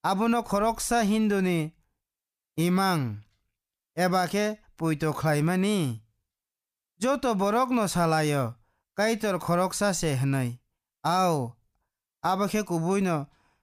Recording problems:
none

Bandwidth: 15 kHz